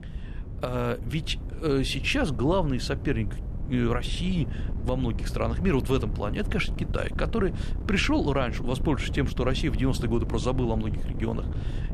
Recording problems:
wind noise on the microphone; occasional gusts; 15 dB below the speech

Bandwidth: 13.5 kHz